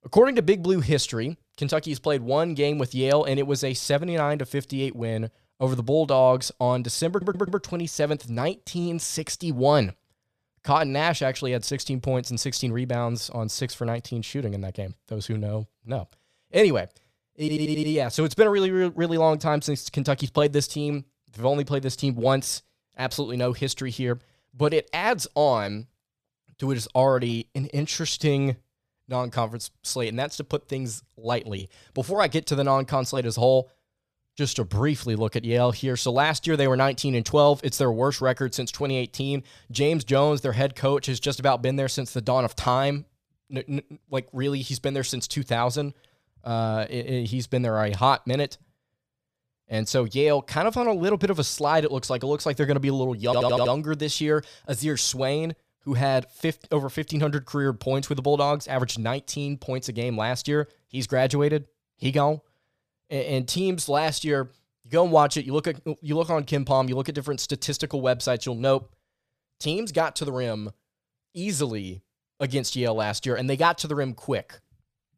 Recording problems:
audio stuttering; at 7 s, at 17 s and at 53 s

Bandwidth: 14.5 kHz